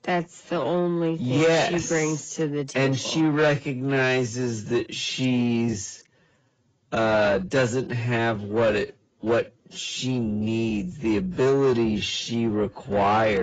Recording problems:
garbled, watery; badly; nothing above 7.5 kHz
wrong speed, natural pitch; too slow; 0.6 times normal speed
distortion; slight; 10 dB below the speech
abrupt cut into speech; at the end

